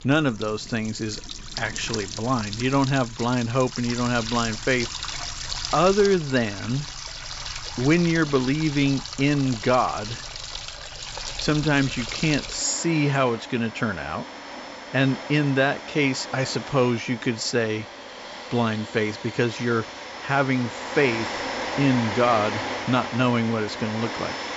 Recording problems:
high frequencies cut off; noticeable; nothing above 8 kHz
household noises; loud; throughout; 9 dB below the speech

